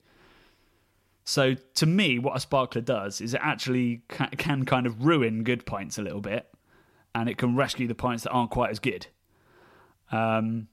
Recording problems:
none

